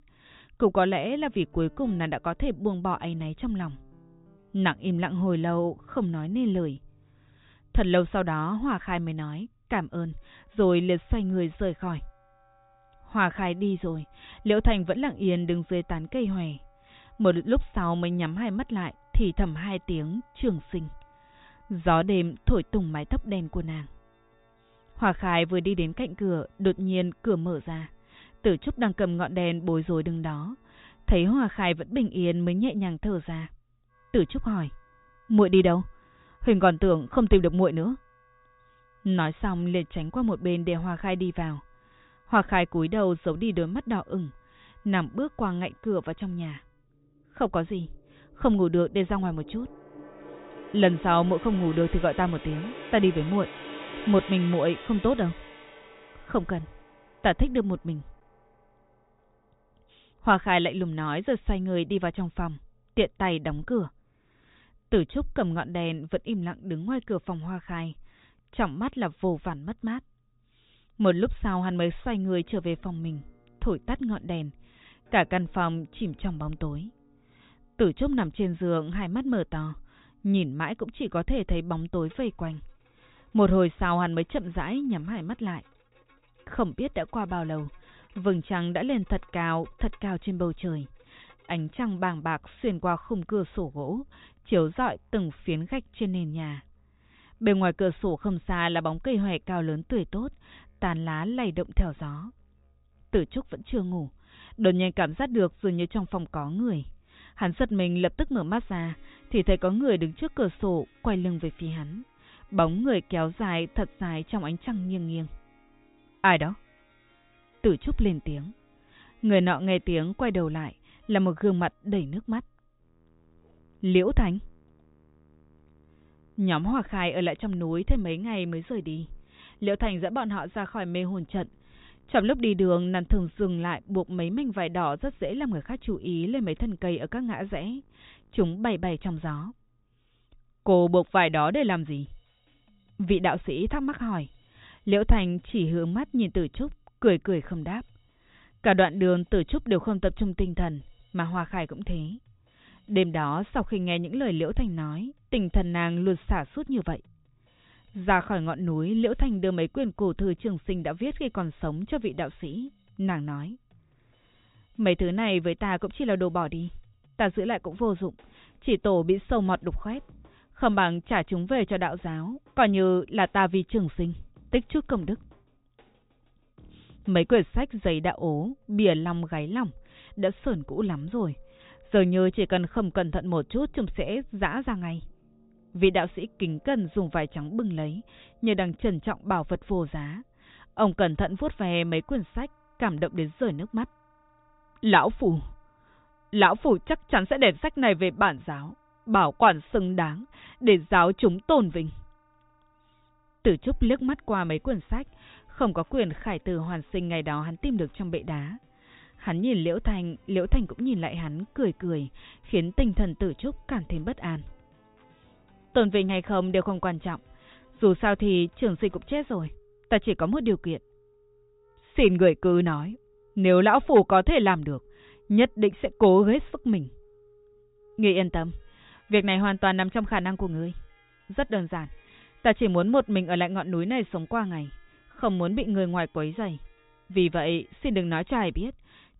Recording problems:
high frequencies cut off; severe; nothing above 4 kHz
background music; faint; throughout; 25 dB below the speech

